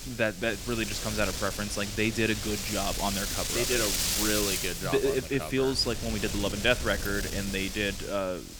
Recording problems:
wind noise on the microphone; heavy; 3 dB below the speech

